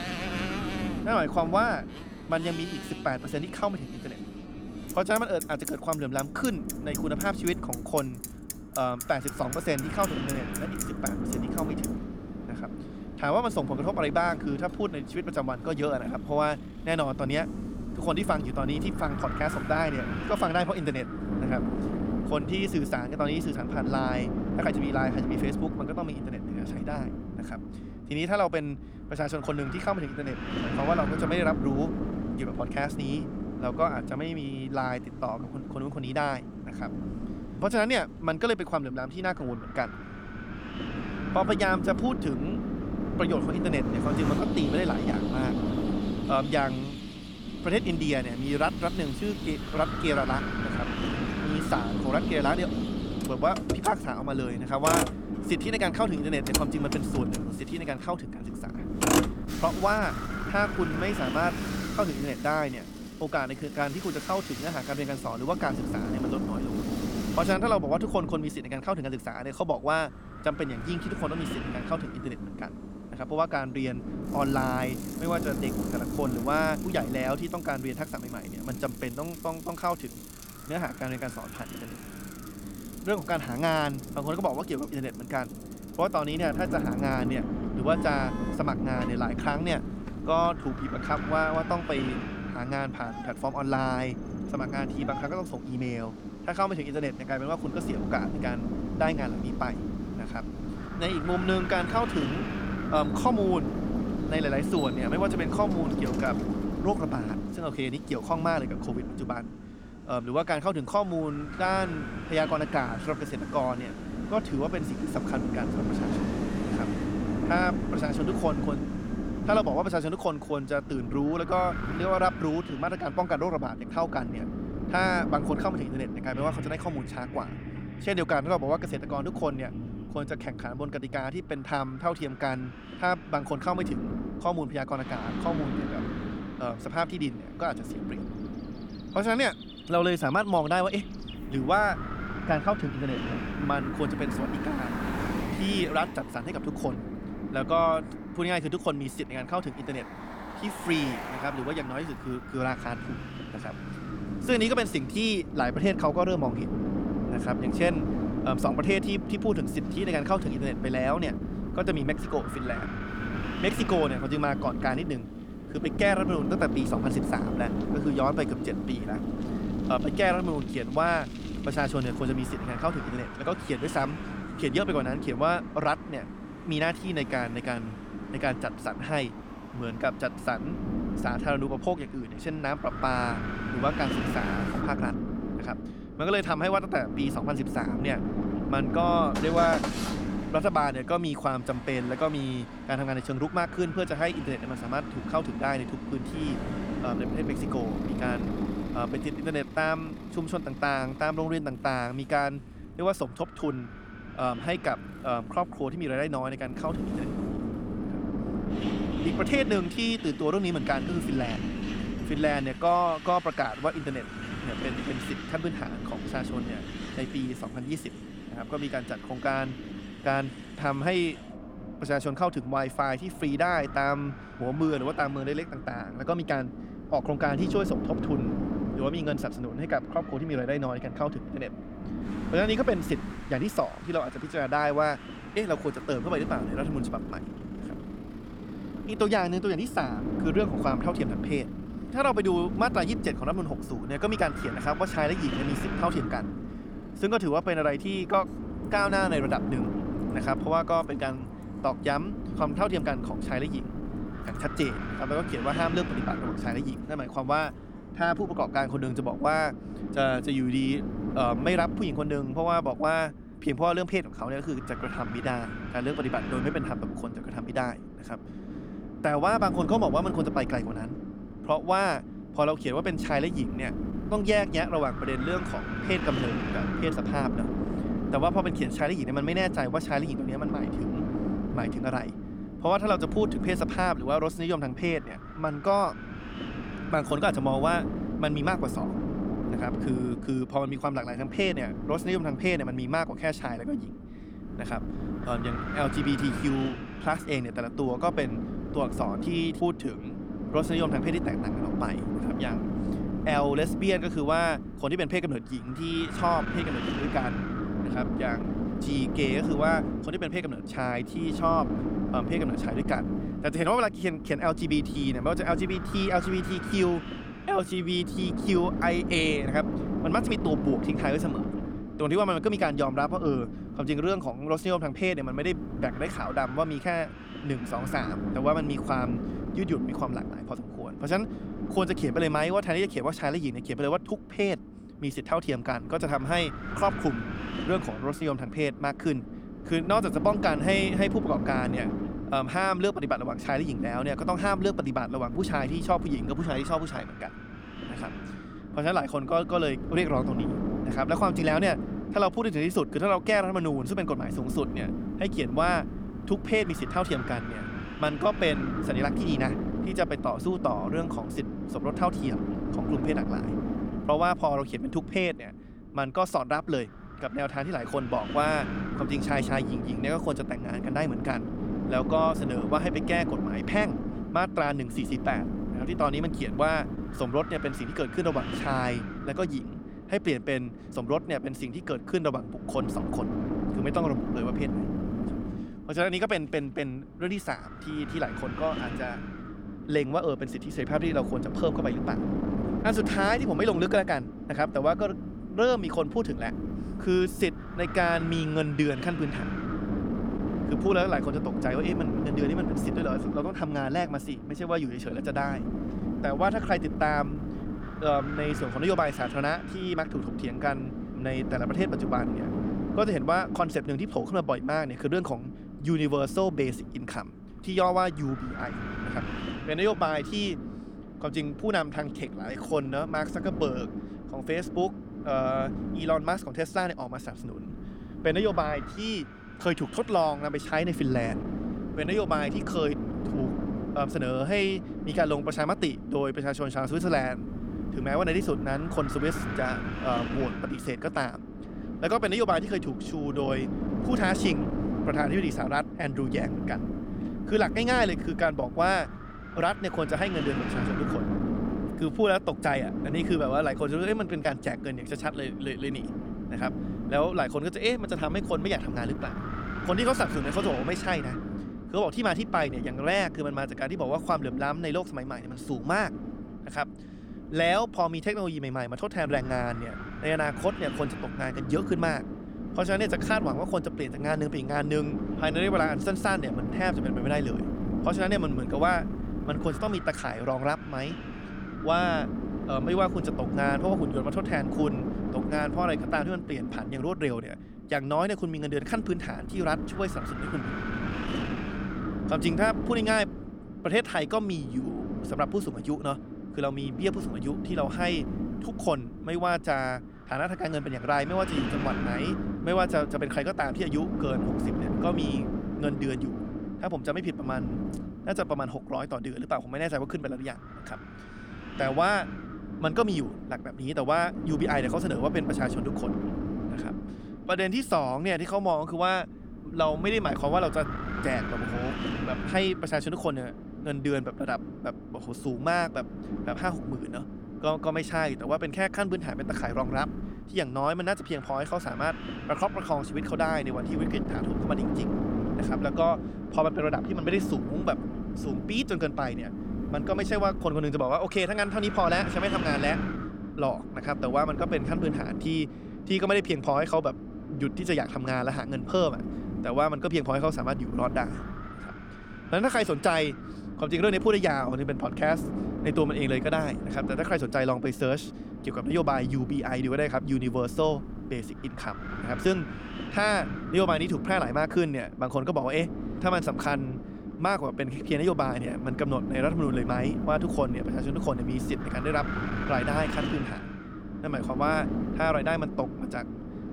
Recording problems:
wind noise on the microphone; heavy; 9 dB below the speech
traffic noise; noticeable; until 4:18; 15 dB below the speech
uneven, jittery; slightly; from 25 s to 7:03

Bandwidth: 18.5 kHz